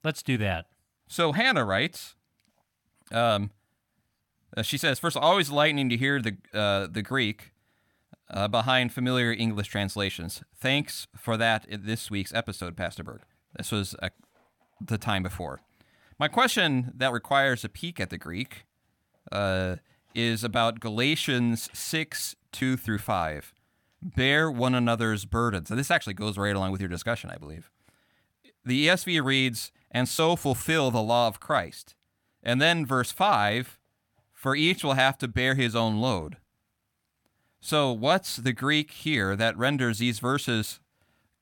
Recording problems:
none

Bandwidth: 17.5 kHz